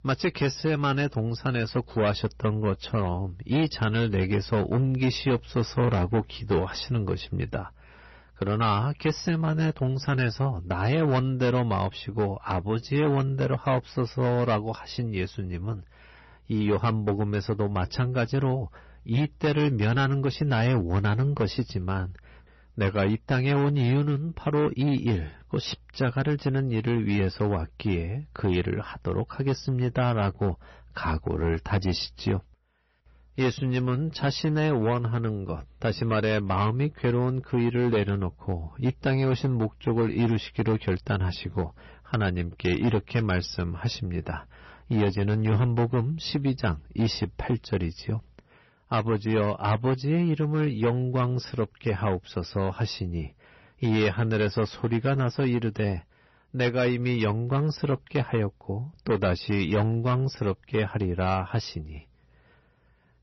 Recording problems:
distortion; slight; 8% of the sound clipped
garbled, watery; slightly; nothing above 6 kHz

